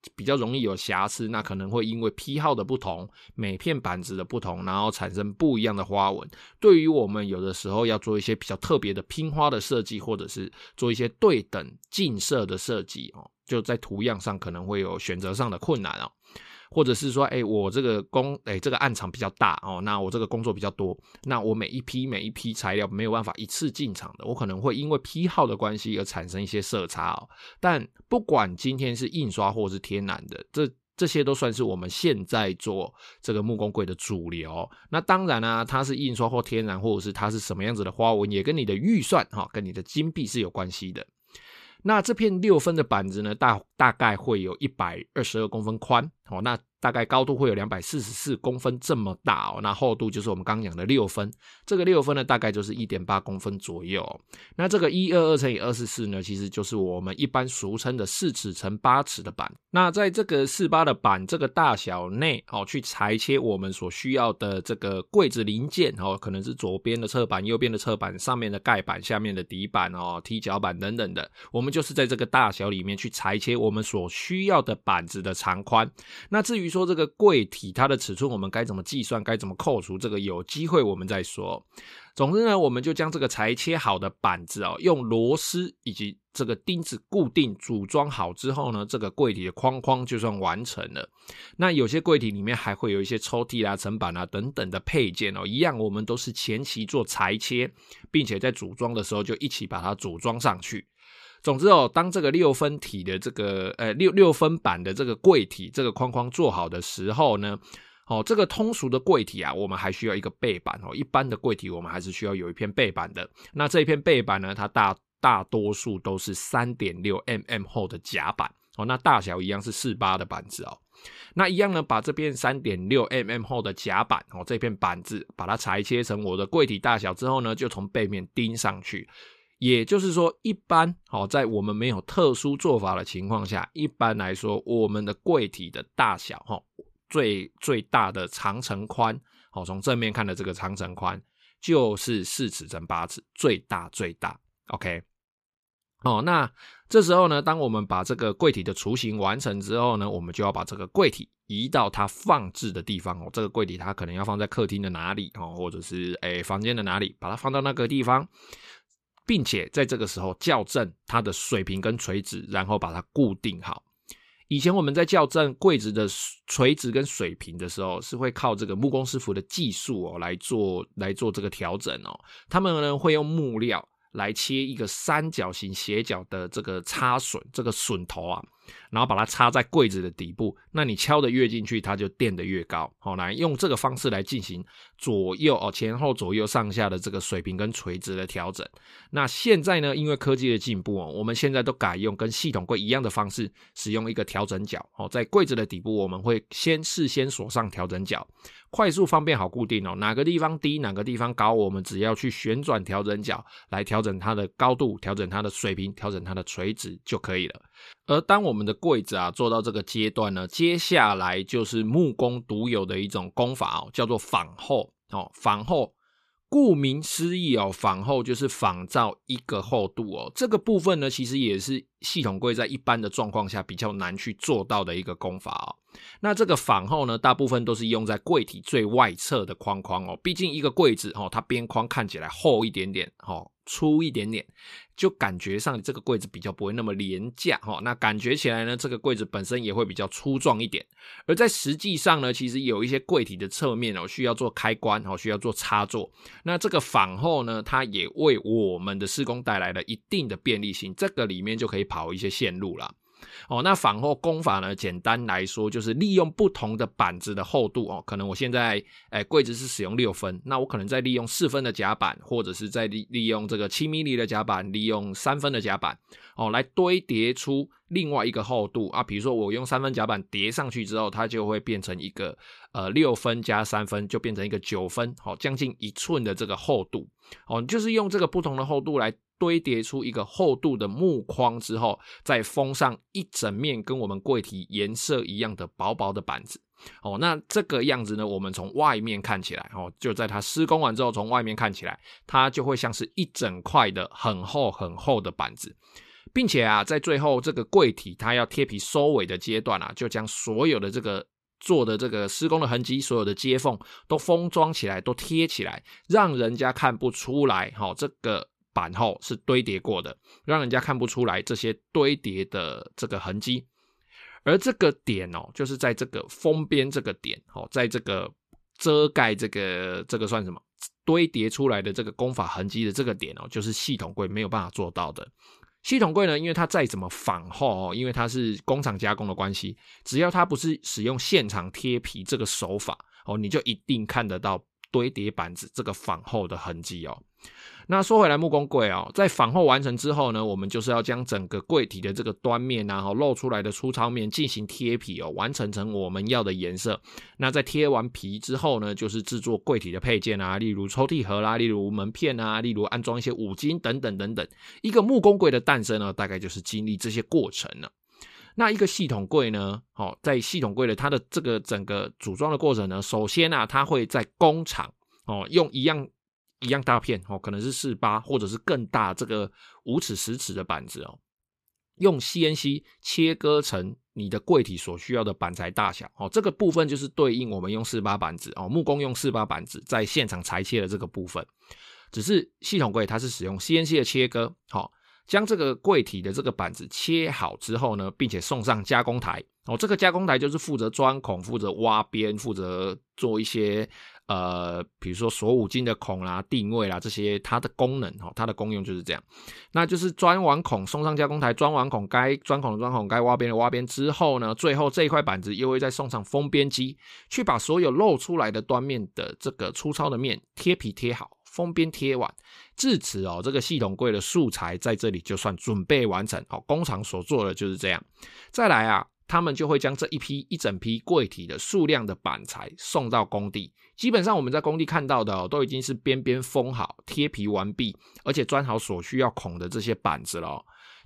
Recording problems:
none

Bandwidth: 14.5 kHz